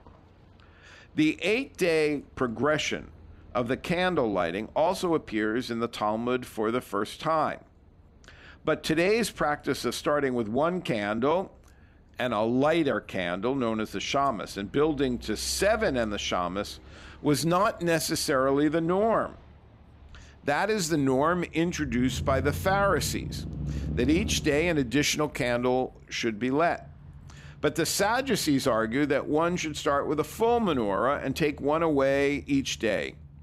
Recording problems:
traffic noise; noticeable; throughout; 15 dB below the speech

